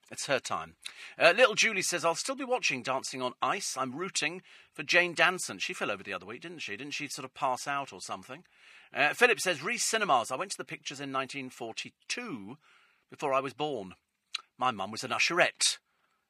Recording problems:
thin; somewhat; fading below 1 kHz

